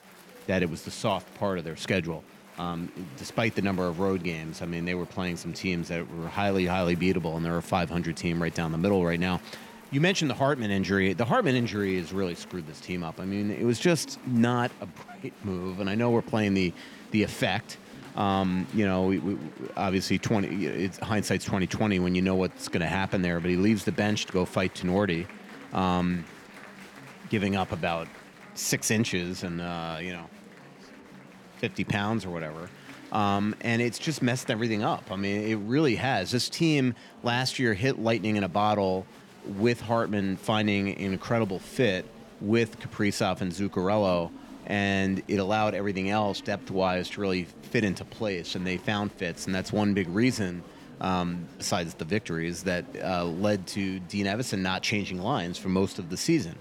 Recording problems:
murmuring crowd; noticeable; throughout; 20 dB below the speech

